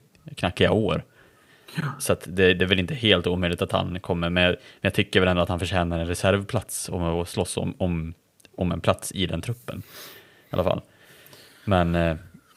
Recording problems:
none

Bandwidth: 15.5 kHz